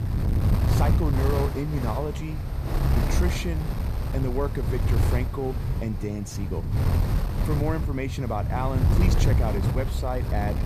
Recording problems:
wind noise on the microphone; heavy; 3 dB below the speech

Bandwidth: 14.5 kHz